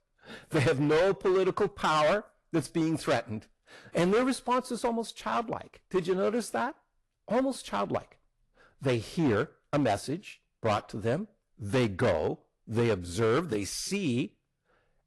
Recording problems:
distortion; heavy; 9% of the sound clipped
garbled, watery; slightly; nothing above 11.5 kHz

